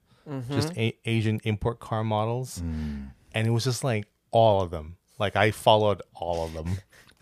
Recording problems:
none

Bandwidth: 15 kHz